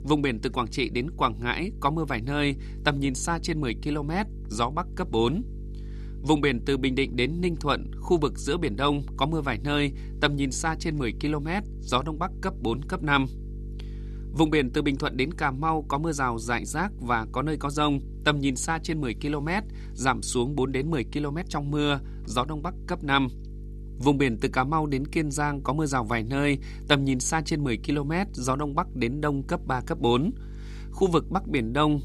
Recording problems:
electrical hum; faint; throughout; 50 Hz, 25 dB below the speech

